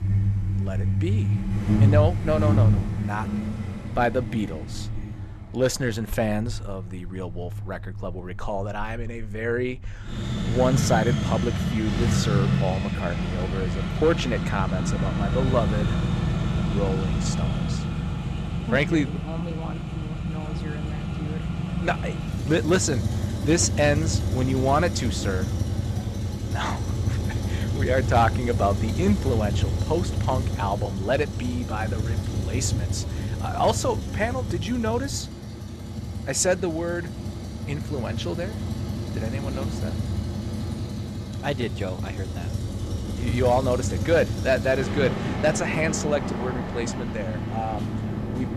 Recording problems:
traffic noise; loud; throughout; as loud as the speech

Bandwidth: 13.5 kHz